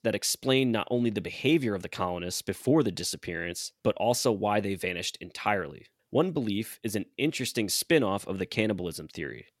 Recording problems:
none

